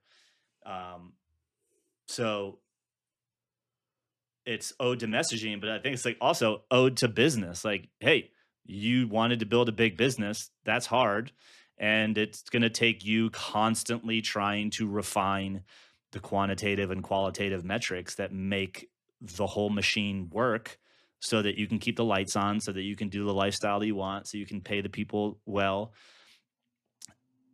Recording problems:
none

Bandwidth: 13.5 kHz